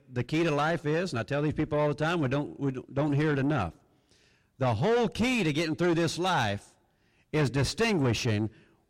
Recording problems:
distortion; heavy; 7 dB below the speech

